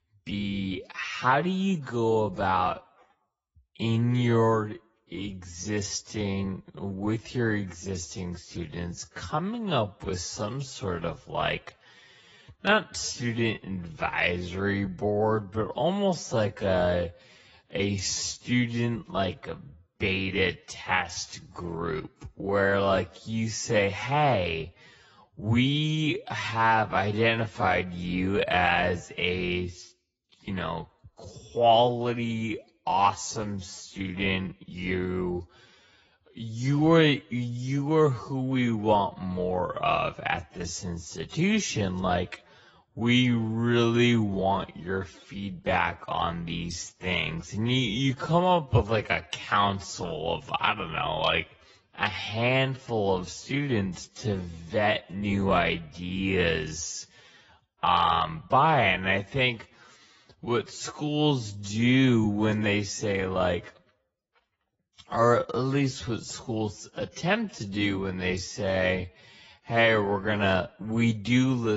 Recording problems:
garbled, watery; badly; nothing above 7.5 kHz
wrong speed, natural pitch; too slow; 0.5 times normal speed
abrupt cut into speech; at the end

